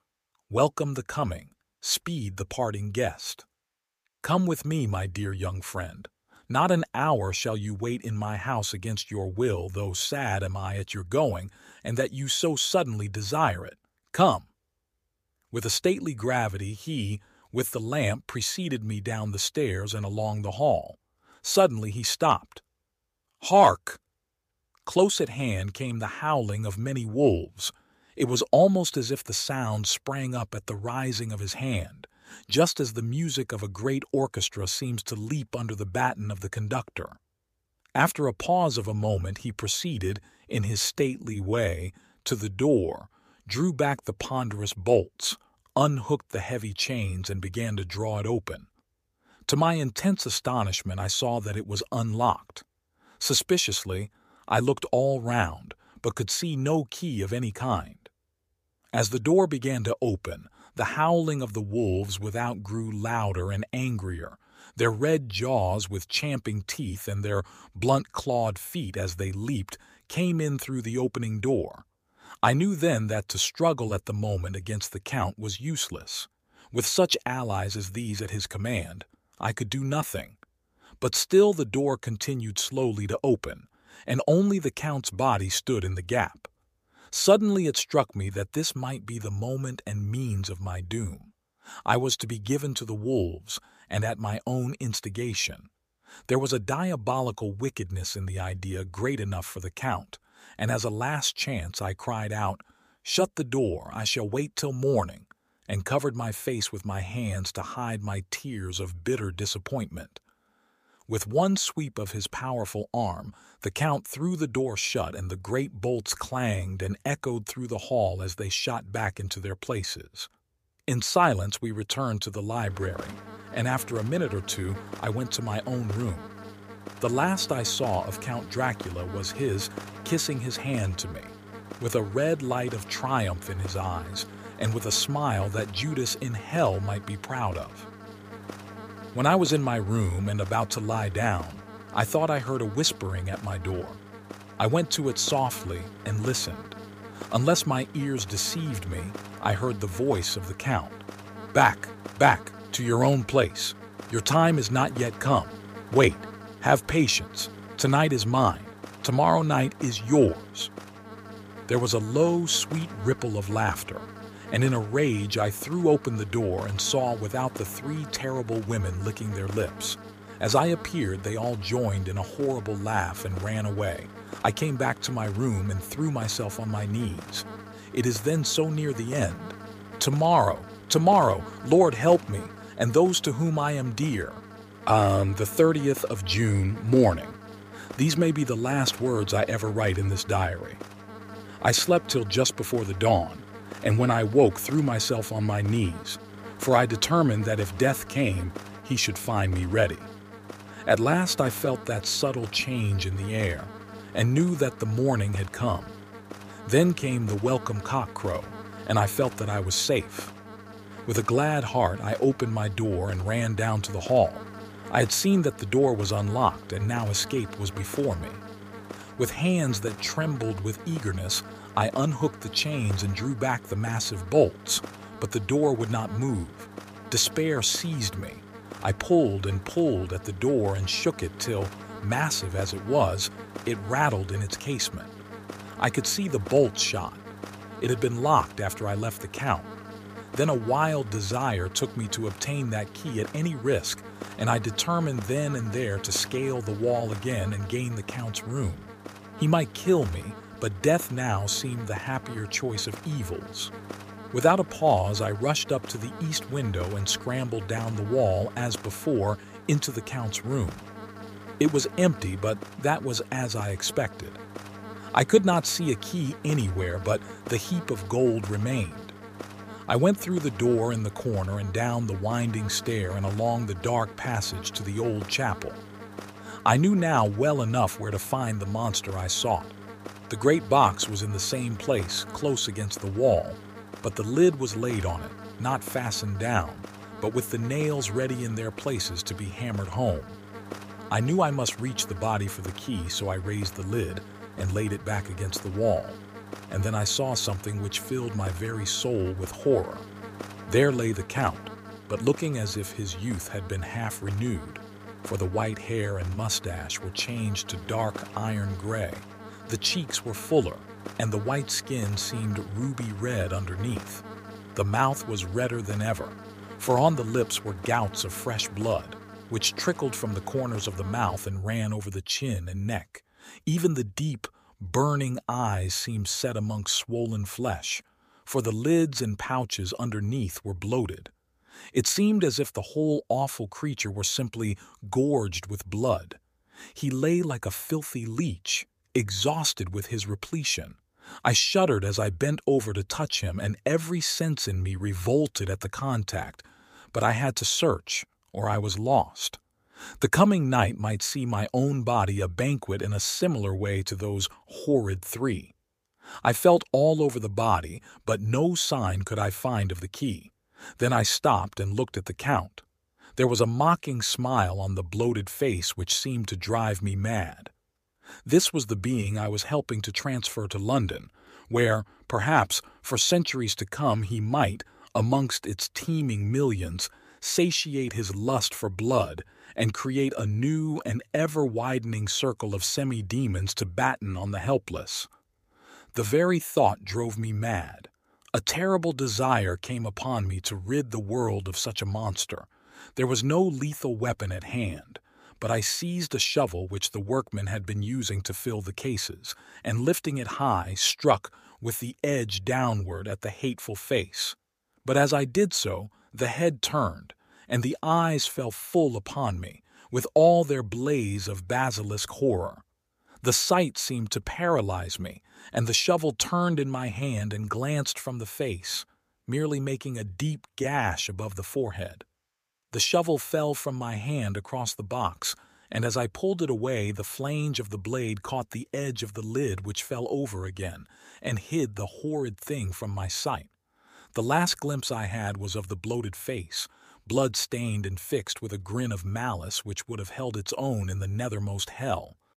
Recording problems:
electrical hum; noticeable; from 2:03 to 5:21; 50 Hz, 15 dB below the speech
uneven, jittery; strongly; from 41 s to 7:01

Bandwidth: 15 kHz